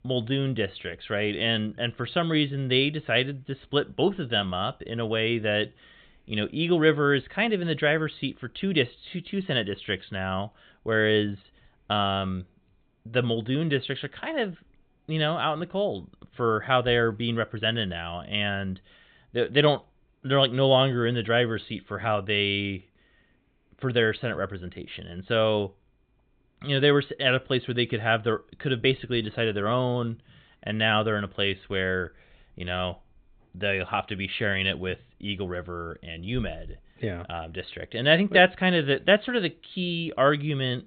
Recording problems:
high frequencies cut off; severe; nothing above 4 kHz

